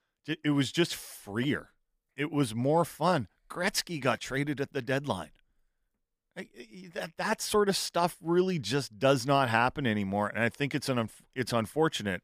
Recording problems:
none

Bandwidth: 15 kHz